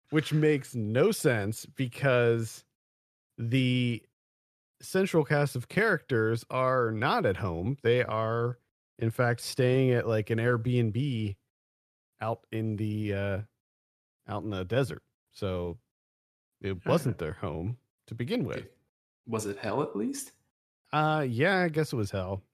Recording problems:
none

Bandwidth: 14 kHz